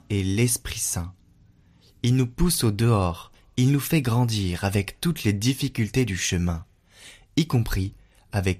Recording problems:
none

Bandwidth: 15 kHz